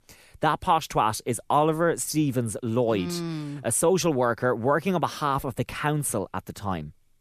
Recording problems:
none

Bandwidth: 14.5 kHz